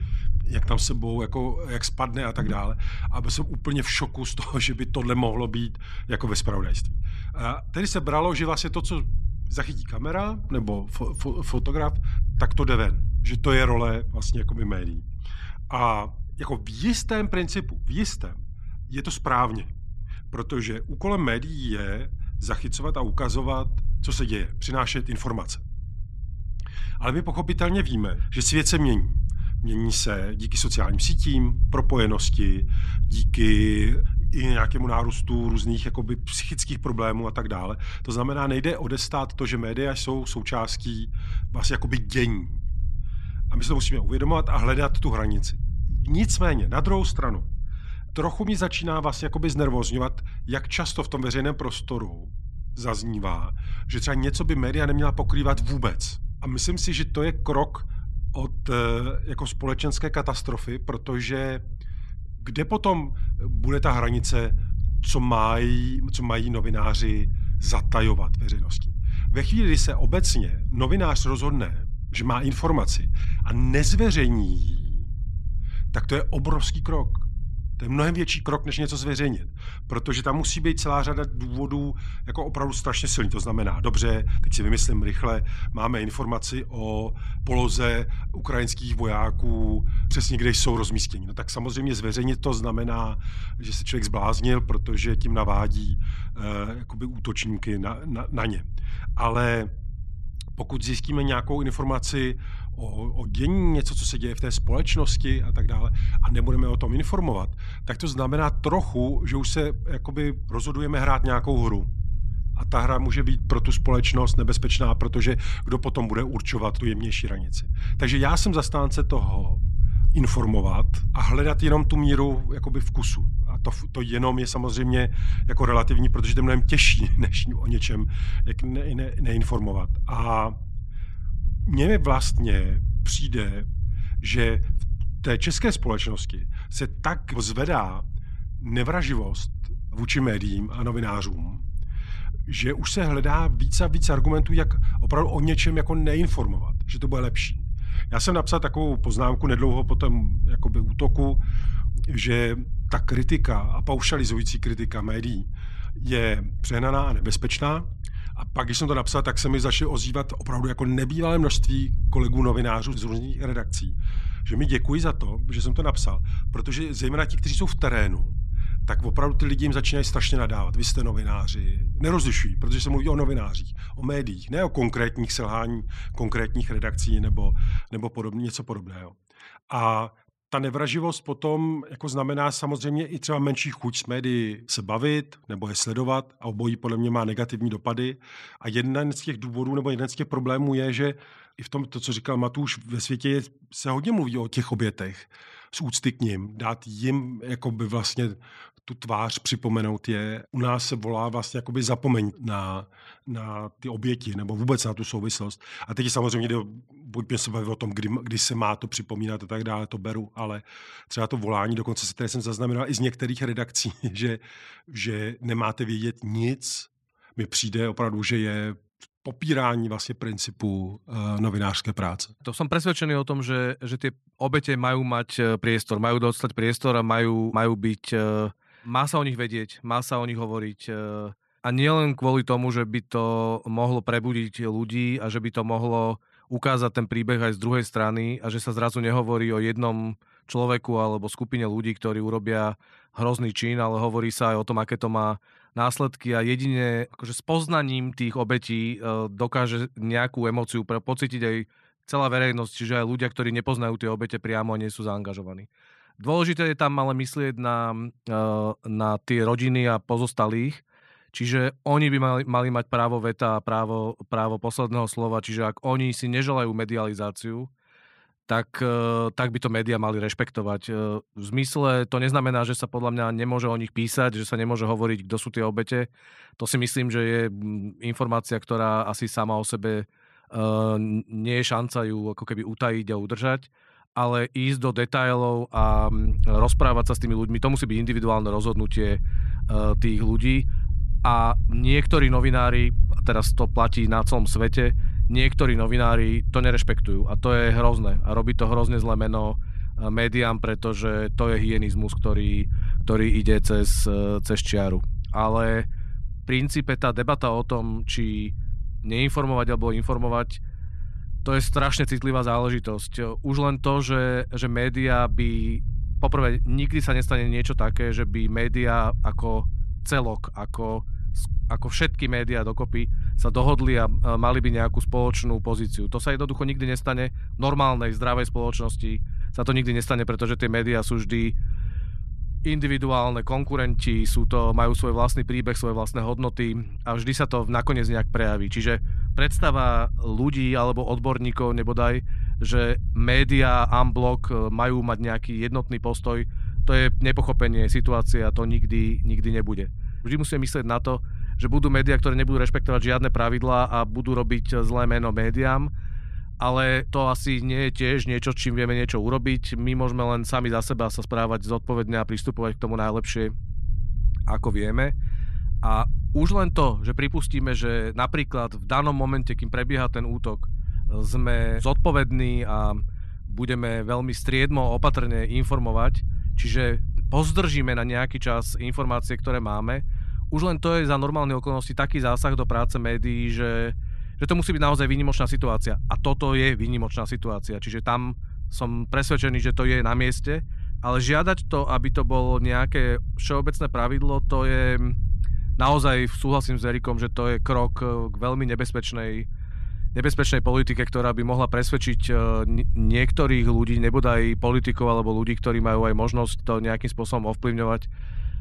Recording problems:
low rumble; faint; until 2:58 and from 4:46 on; 20 dB below the speech

